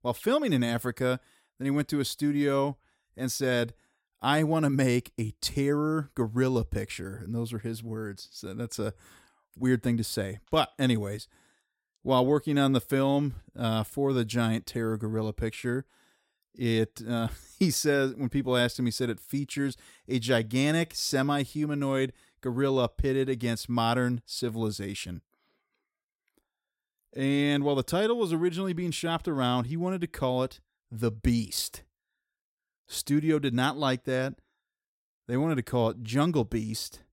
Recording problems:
none

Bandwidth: 16 kHz